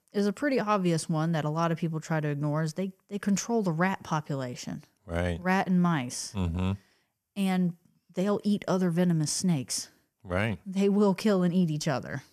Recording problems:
none

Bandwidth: 14.5 kHz